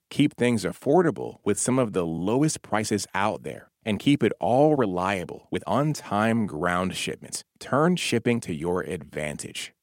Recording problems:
uneven, jittery; strongly; from 1 to 9.5 s

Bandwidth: 16 kHz